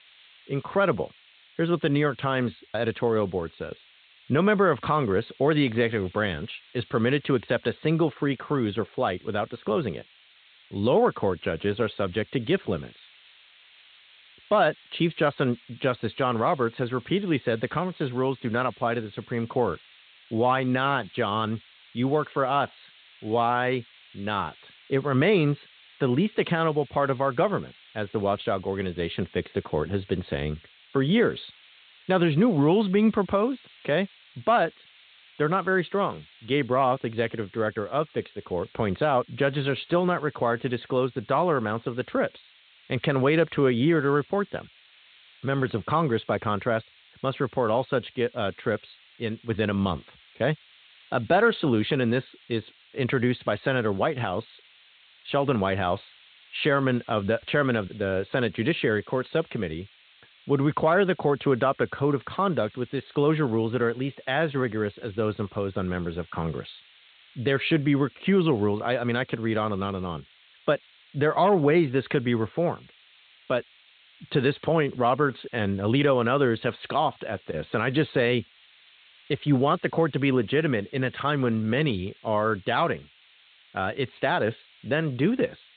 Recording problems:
high frequencies cut off; severe; nothing above 4 kHz
hiss; faint; throughout; 25 dB below the speech

